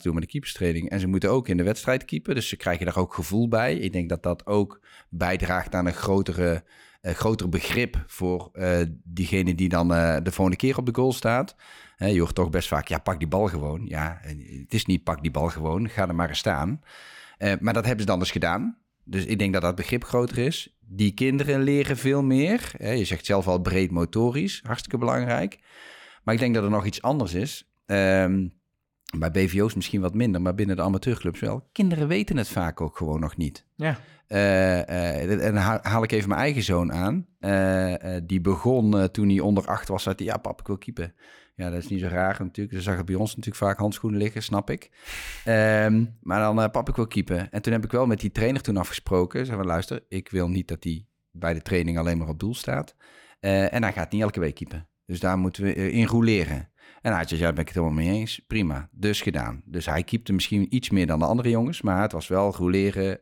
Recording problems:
none

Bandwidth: 17.5 kHz